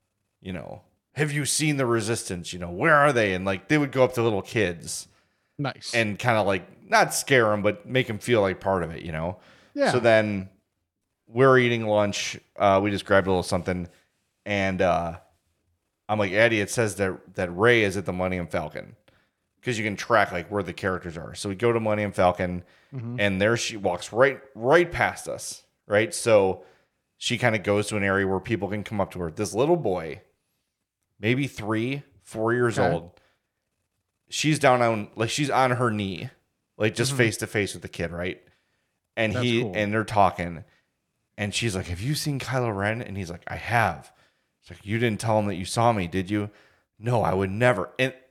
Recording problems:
none

